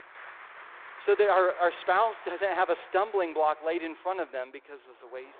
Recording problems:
phone-call audio; nothing above 3.5 kHz
traffic noise; noticeable; throughout; 20 dB below the speech

